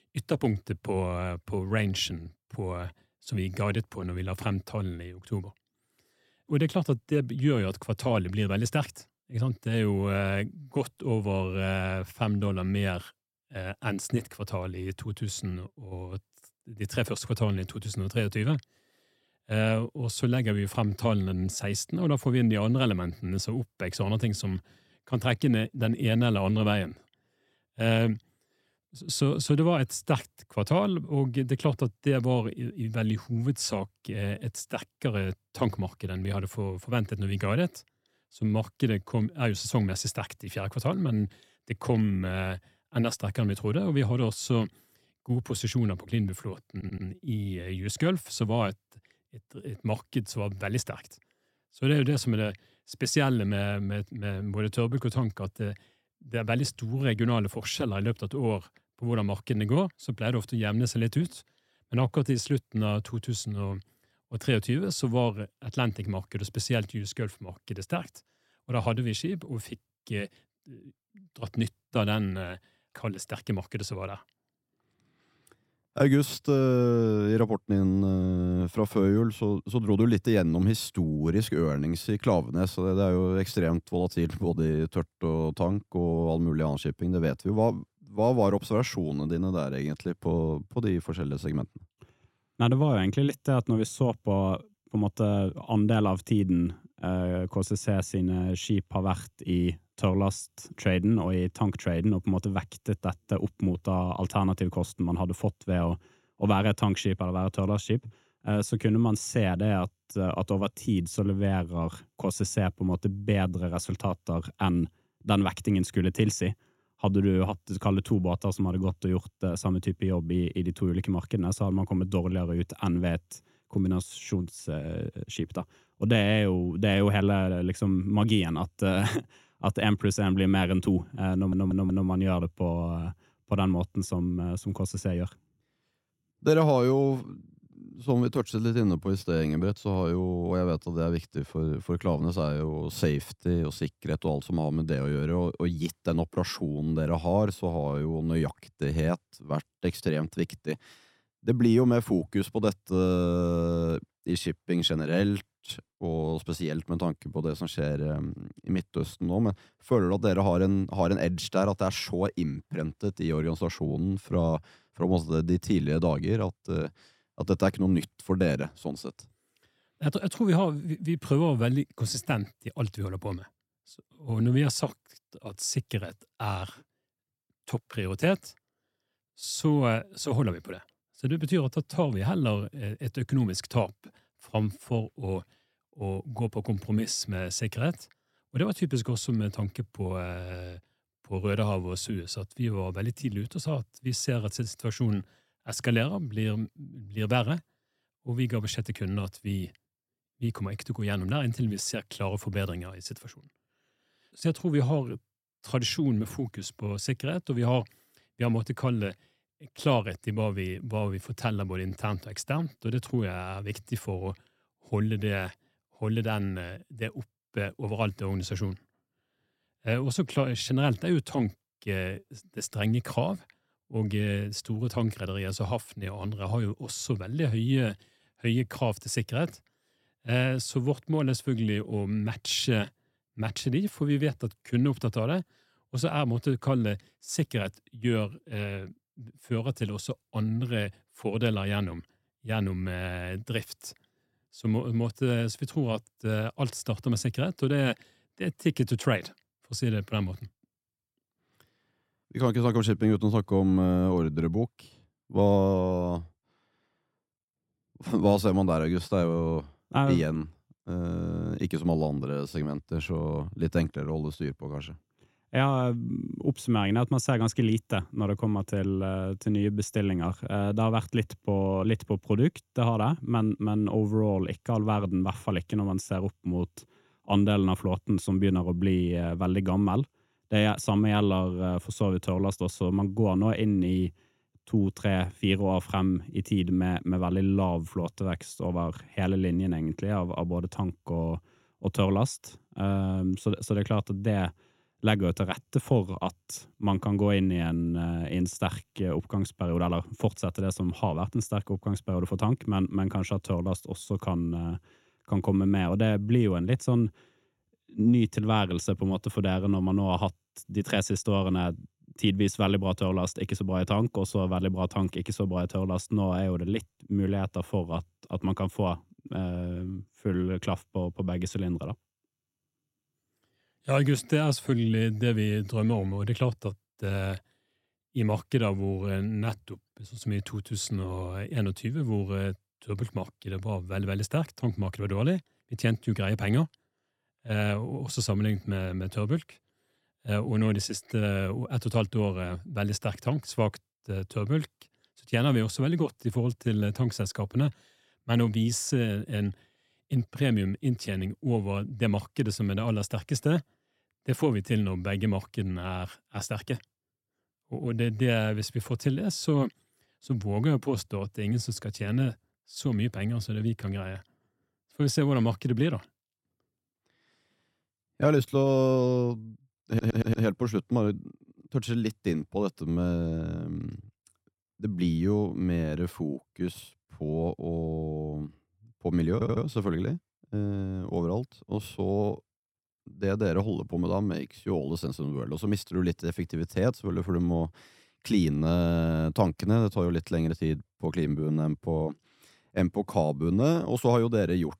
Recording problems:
audio stuttering; 4 times, first at 47 s

